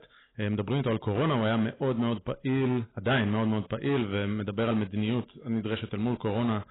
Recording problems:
garbled, watery; badly; nothing above 4 kHz
distortion; slight; 10% of the sound clipped

